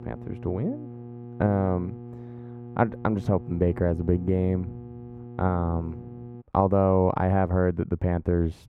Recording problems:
muffled; very; fading above 2.5 kHz
electrical hum; noticeable; until 6.5 s; 60 Hz, 20 dB below the speech

